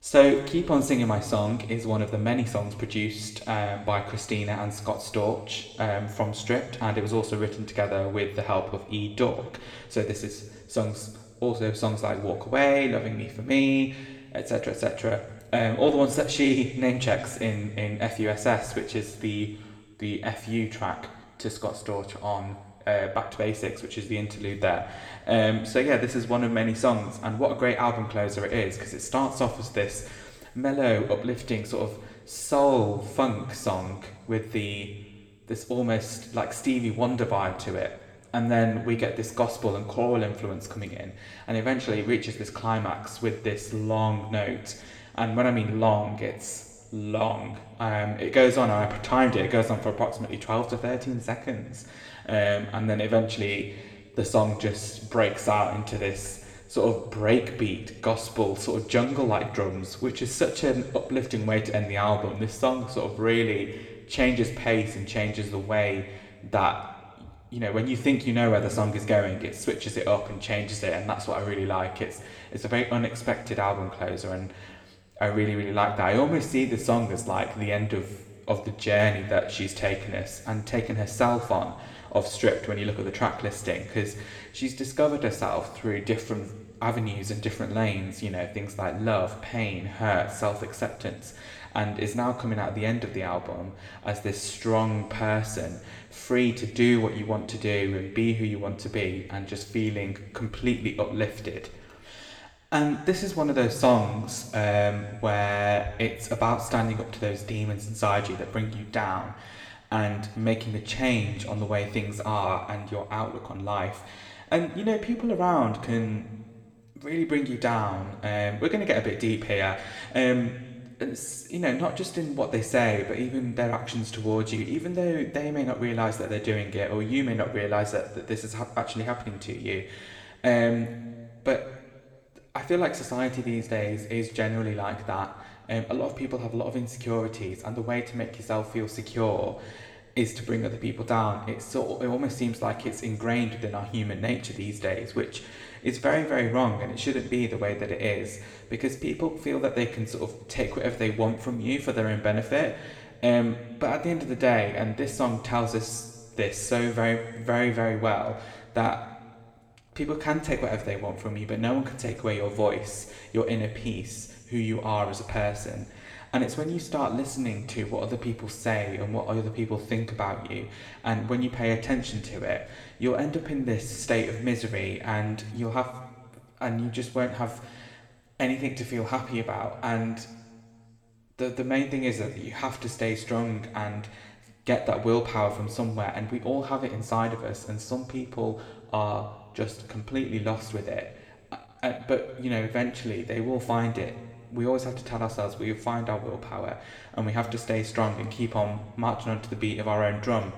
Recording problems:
room echo; slight; dies away in 1.3 s
off-mic speech; somewhat distant

